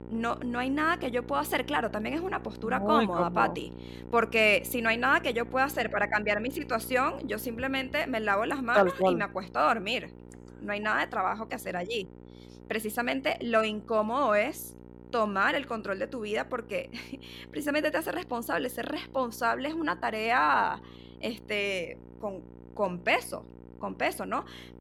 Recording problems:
electrical hum; faint; throughout; 60 Hz, 25 dB below the speech

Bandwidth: 17 kHz